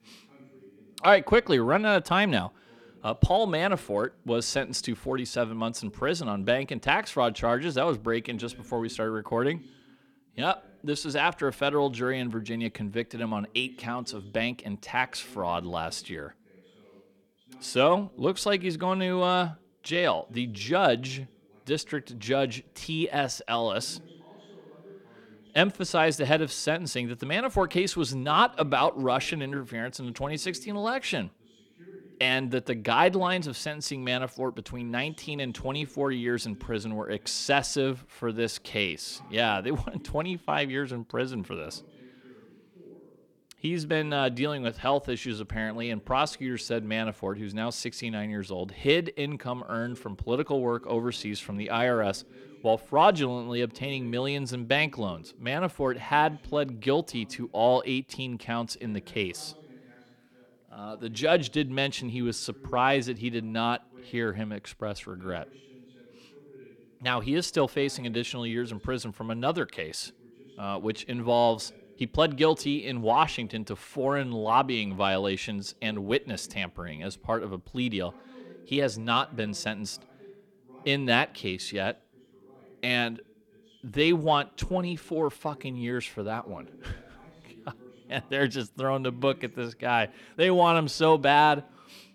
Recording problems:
voice in the background; faint; throughout; 25 dB below the speech

